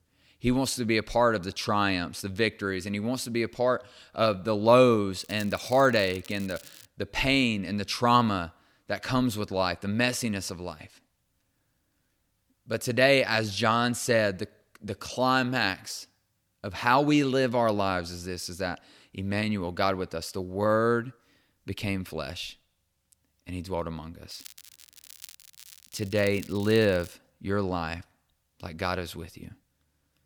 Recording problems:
crackling; faint; from 5 to 7 s and from 24 to 27 s; 20 dB below the speech

